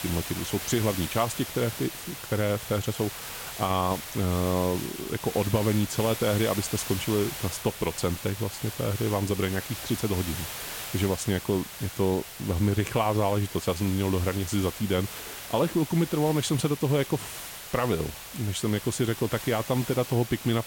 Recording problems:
hiss; loud; throughout; 8 dB below the speech

